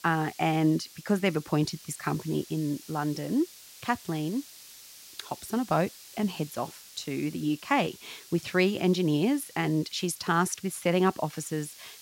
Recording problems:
hiss; noticeable; throughout; 20 dB below the speech

